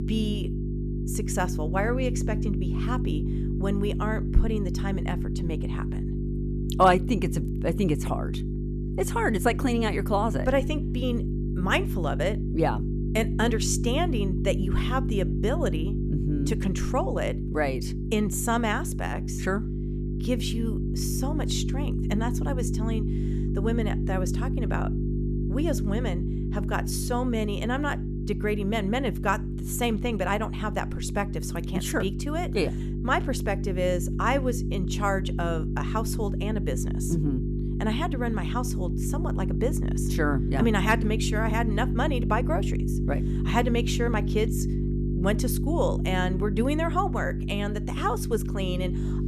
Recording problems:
electrical hum; loud; throughout; 50 Hz, 8 dB below the speech

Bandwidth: 14 kHz